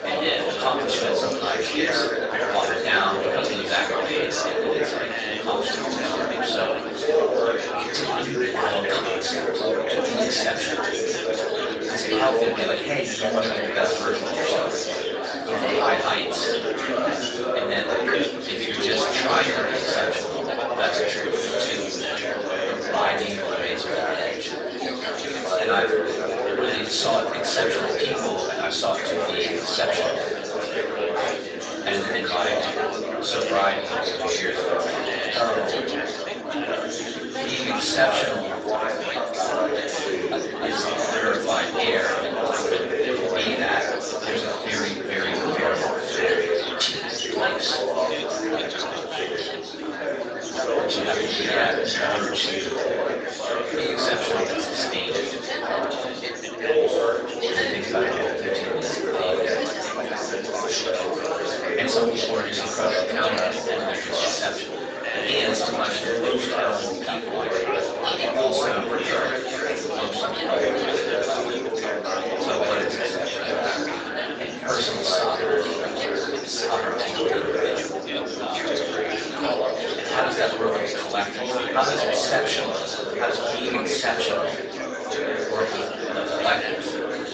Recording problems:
off-mic speech; far
thin; somewhat; fading below 450 Hz
room echo; slight; dies away in 0.4 s
garbled, watery; slightly; nothing above 7.5 kHz
chatter from many people; very loud; throughout; 2 dB above the speech

